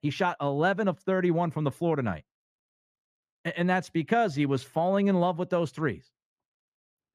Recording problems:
muffled; slightly; fading above 2 kHz

